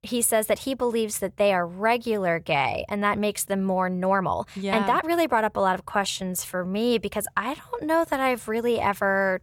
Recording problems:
uneven, jittery; strongly; from 4 to 8.5 s

